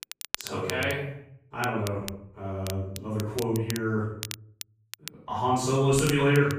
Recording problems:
off-mic speech; far
room echo; noticeable; dies away in 0.6 s
crackle, like an old record; noticeable; 10 dB below the speech

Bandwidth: 15 kHz